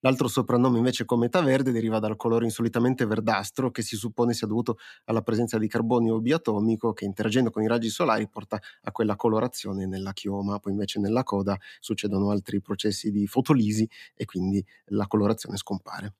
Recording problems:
none

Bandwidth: 14.5 kHz